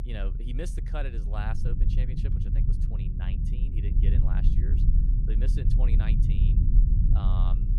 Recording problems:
low rumble; loud; throughout; as loud as the speech

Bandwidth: 15 kHz